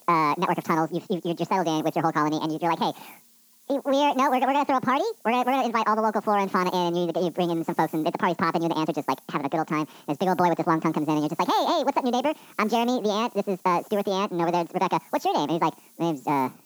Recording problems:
wrong speed and pitch; too fast and too high; 1.7 times normal speed
high frequencies cut off; noticeable; nothing above 8 kHz
muffled; very slightly; fading above 2.5 kHz
hiss; faint; throughout; 25 dB below the speech

